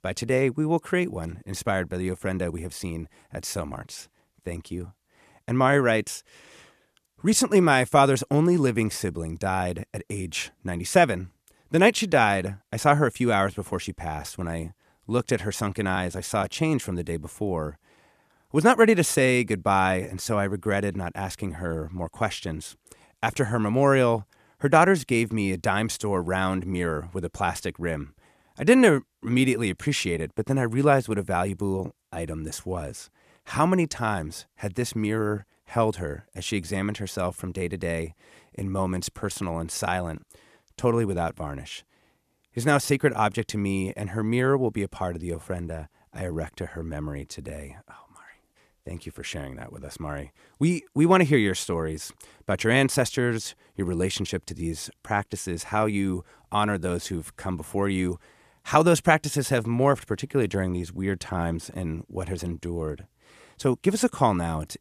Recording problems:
none

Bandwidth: 14 kHz